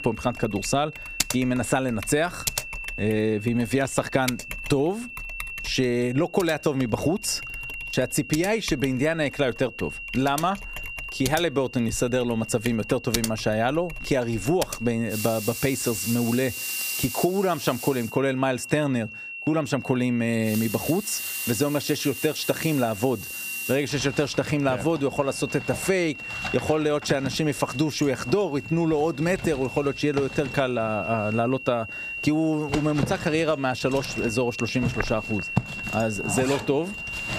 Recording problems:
squashed, flat; somewhat, background pumping
household noises; loud; throughout; 9 dB below the speech
high-pitched whine; noticeable; throughout; 3 kHz, 10 dB below the speech

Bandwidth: 15 kHz